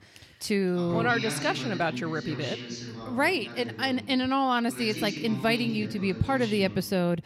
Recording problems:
voice in the background; loud; throughout; 9 dB below the speech

